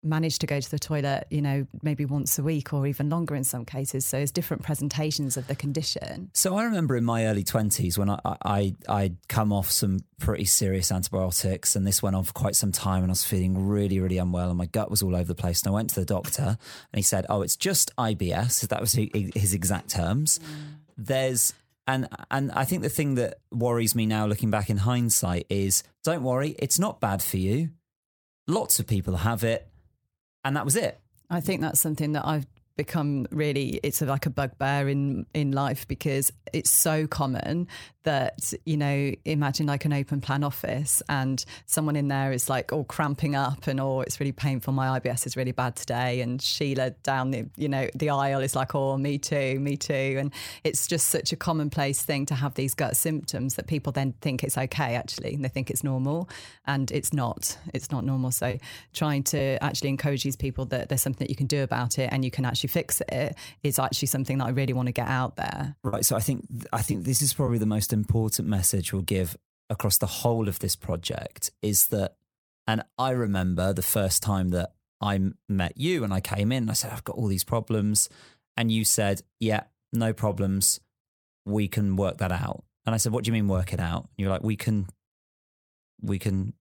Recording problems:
choppy; occasionally; from 1:06 to 1:07; 4% of the speech affected

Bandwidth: 18.5 kHz